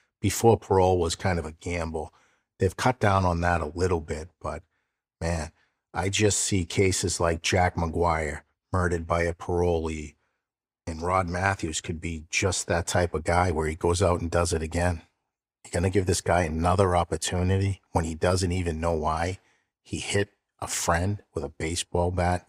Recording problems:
none

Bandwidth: 15.5 kHz